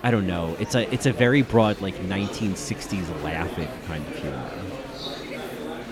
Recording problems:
chatter from many people; loud; throughout; 10 dB below the speech

